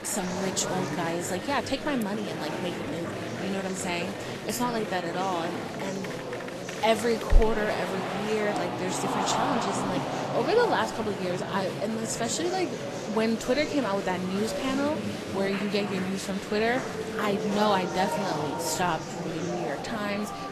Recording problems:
garbled, watery; slightly; nothing above 13 kHz
murmuring crowd; loud; throughout; 3 dB below the speech

